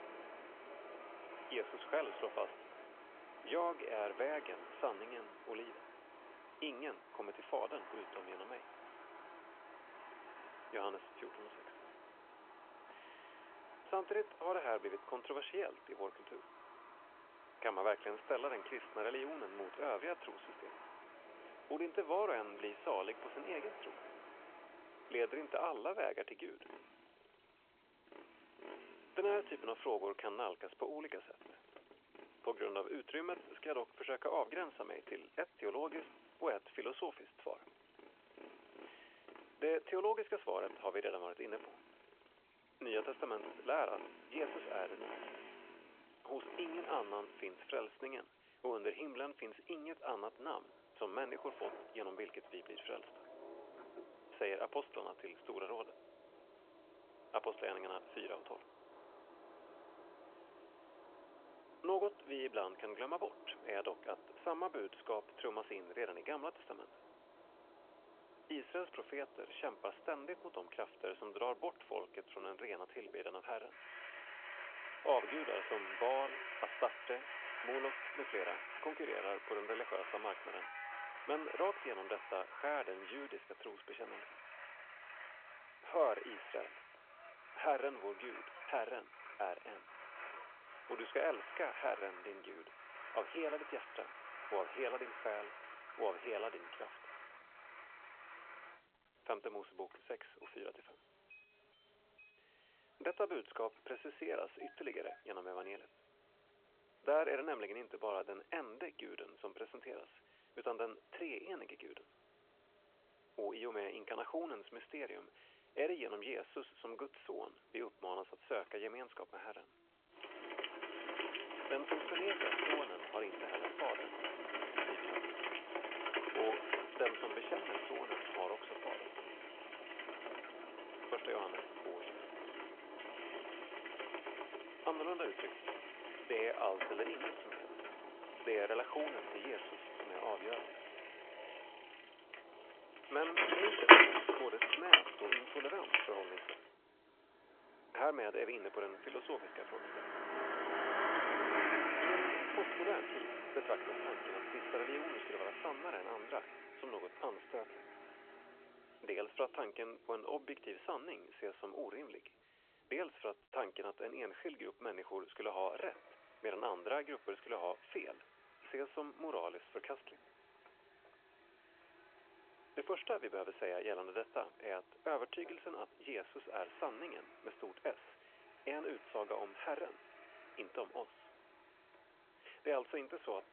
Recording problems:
phone-call audio
traffic noise; very loud; throughout; 4 dB above the speech

